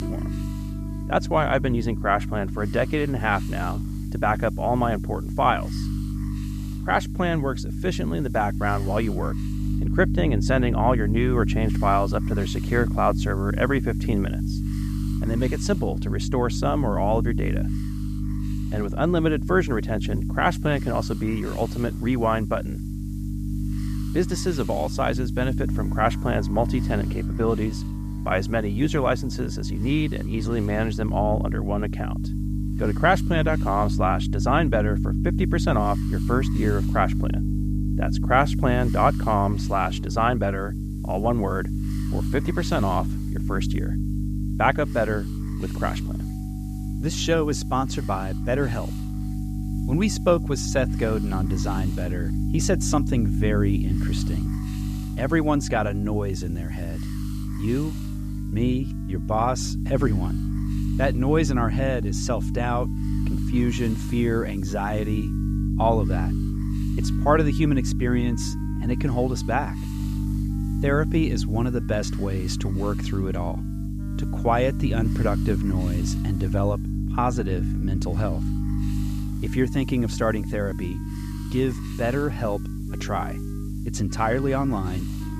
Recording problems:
electrical hum; noticeable; throughout; 50 Hz, 10 dB below the speech
background music; faint; throughout; 25 dB below the speech
hiss; faint; throughout; 25 dB below the speech

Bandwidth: 14.5 kHz